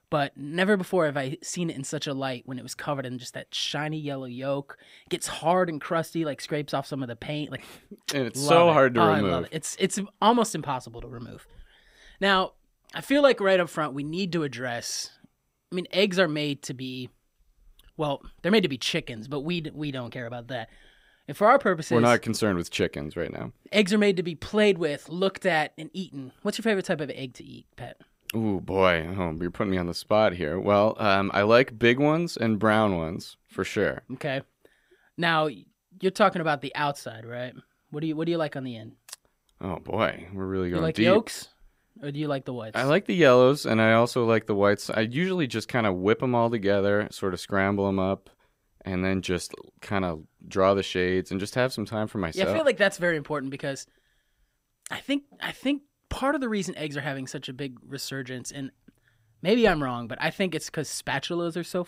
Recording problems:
none

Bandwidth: 15.5 kHz